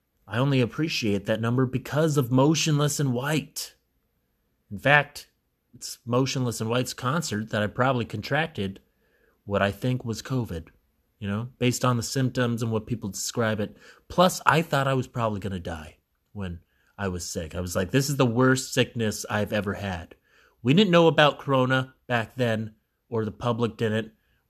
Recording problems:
none

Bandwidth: 13.5 kHz